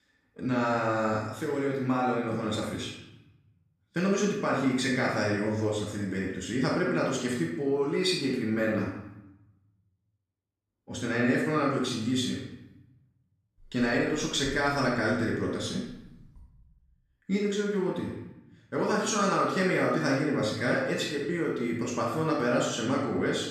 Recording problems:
off-mic speech; far
room echo; noticeable; dies away in 0.9 s

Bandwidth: 14.5 kHz